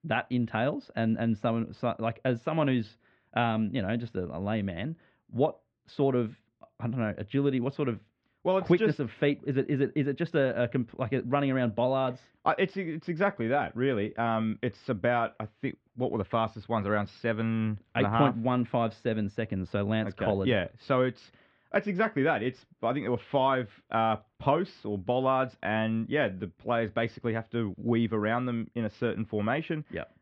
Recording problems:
muffled; very; fading above 3 kHz

